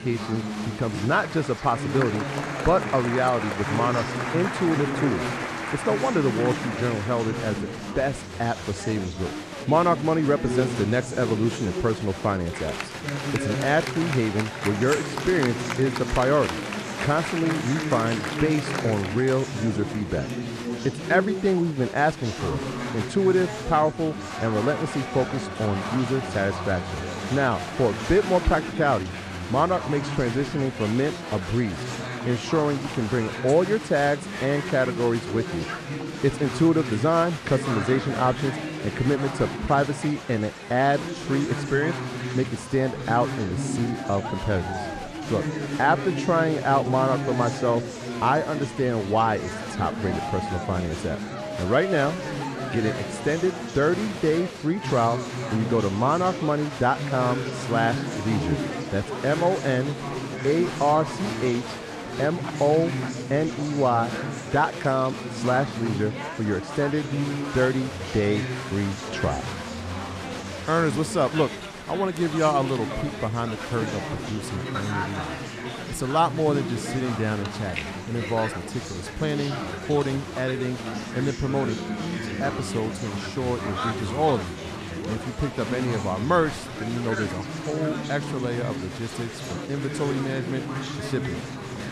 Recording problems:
chatter from many people; loud; throughout; 6 dB below the speech

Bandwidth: 14.5 kHz